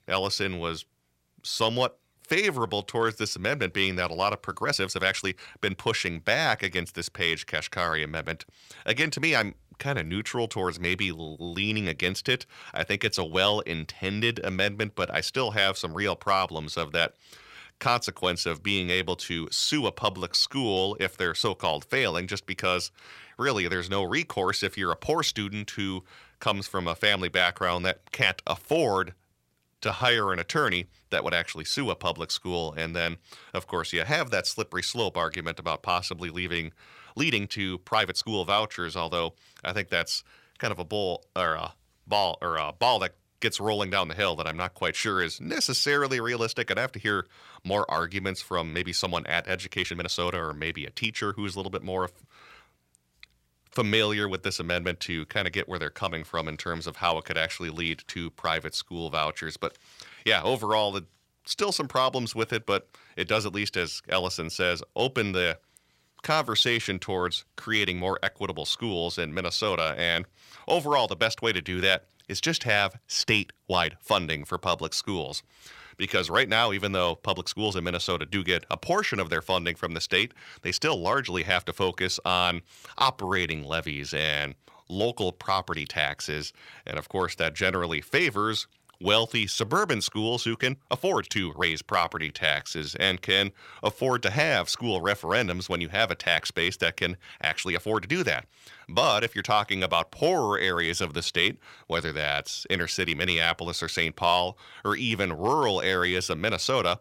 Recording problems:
uneven, jittery; strongly; from 2 s to 1:40

